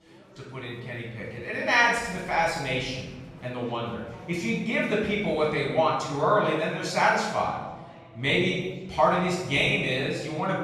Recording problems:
off-mic speech; far
room echo; noticeable; dies away in 1 s
murmuring crowd; faint; throughout; 25 dB below the speech

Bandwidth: 14 kHz